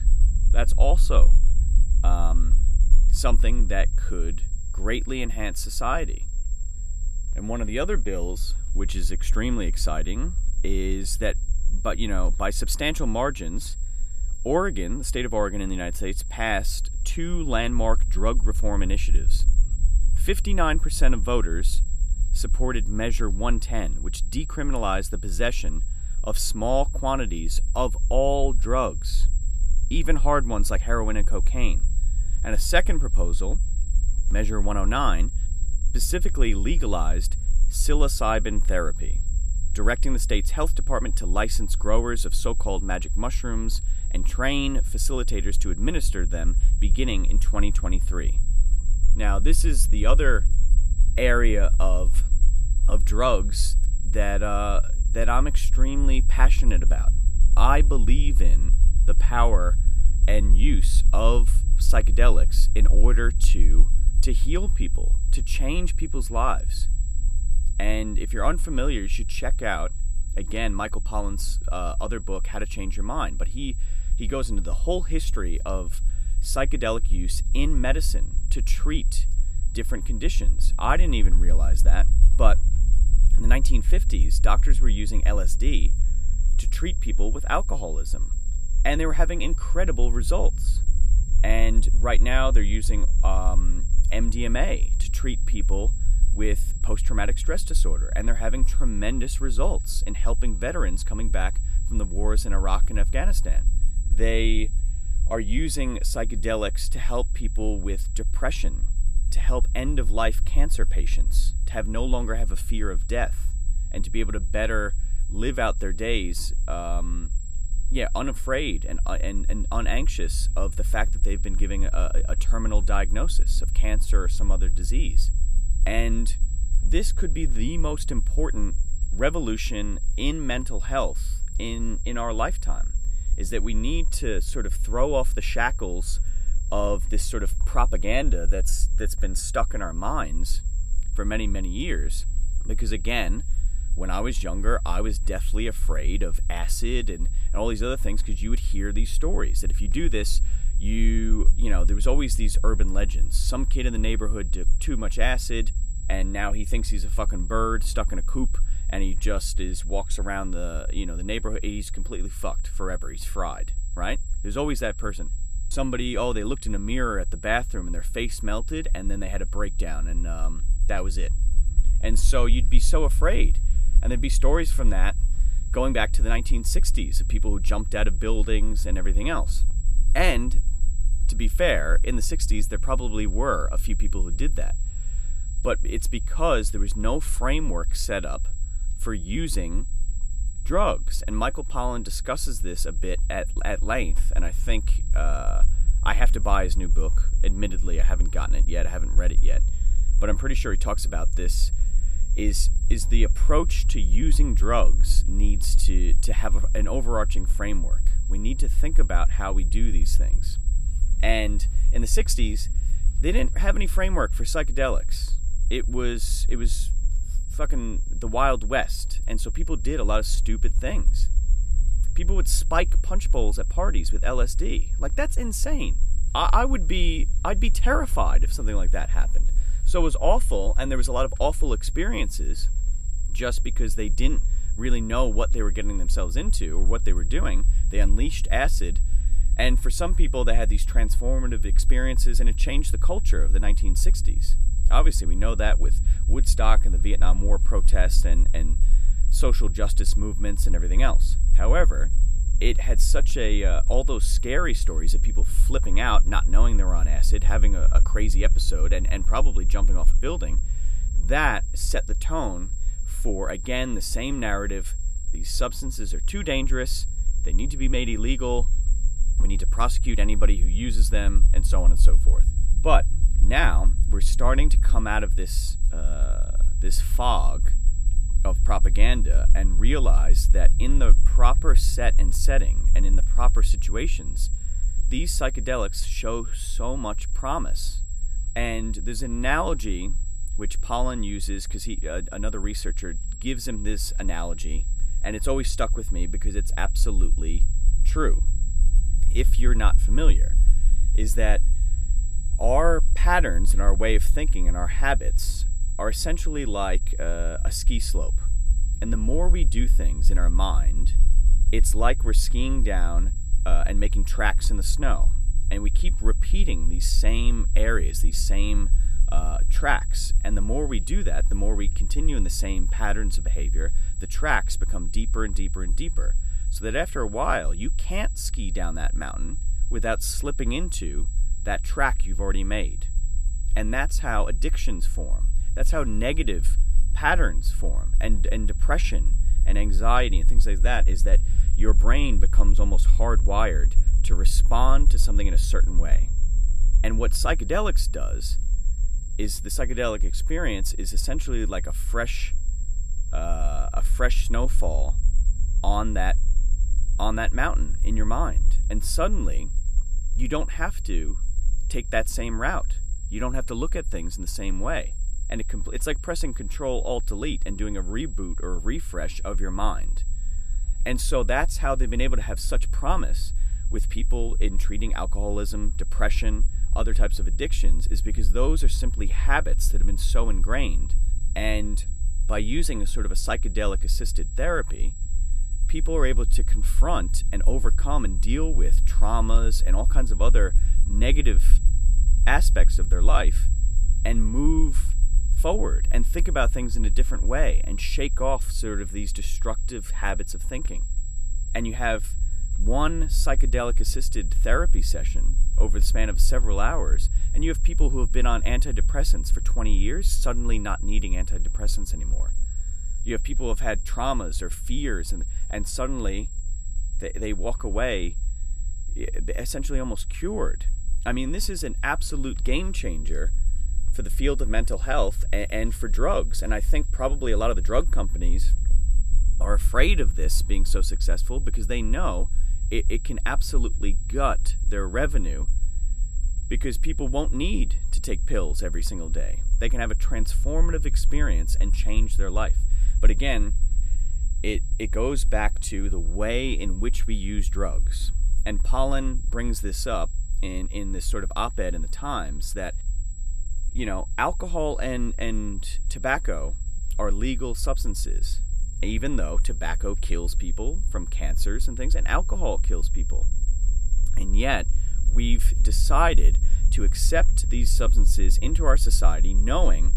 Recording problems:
high-pitched whine; noticeable; throughout; 7.5 kHz, 15 dB below the speech
low rumble; faint; throughout; 20 dB below the speech

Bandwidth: 14 kHz